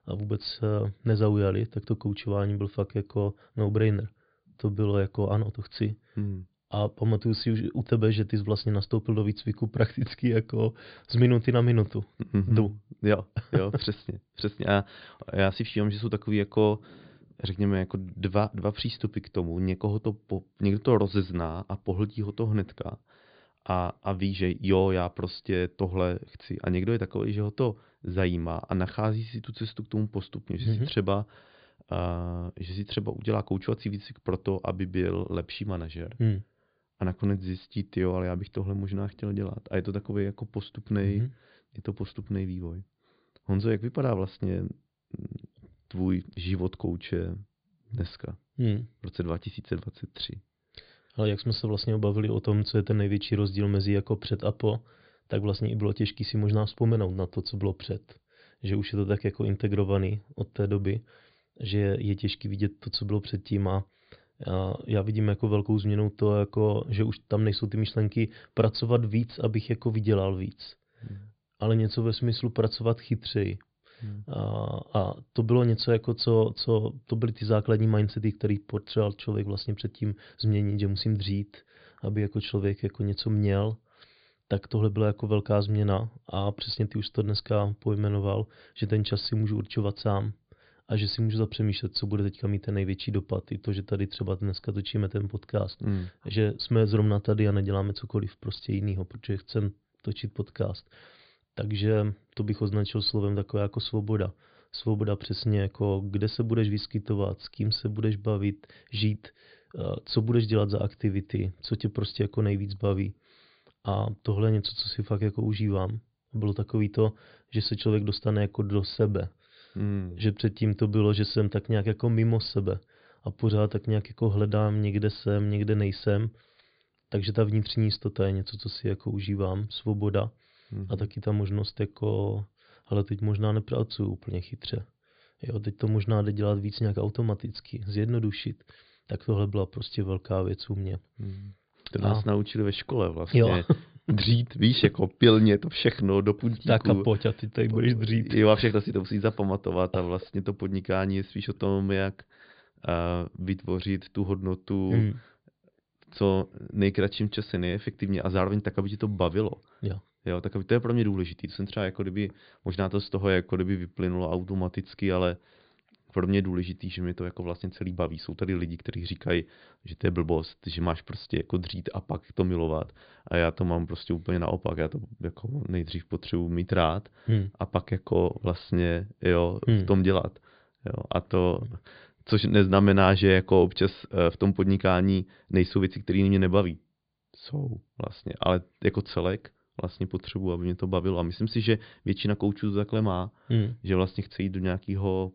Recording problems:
high frequencies cut off; severe; nothing above 5 kHz

